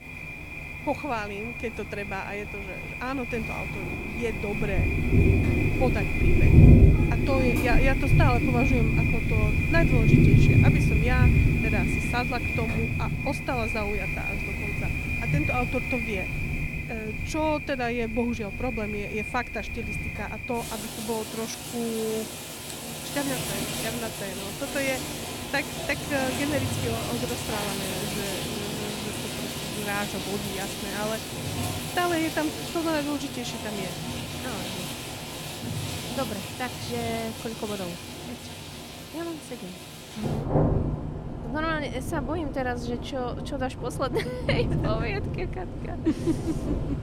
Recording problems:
rain or running water; very loud; throughout; 4 dB above the speech

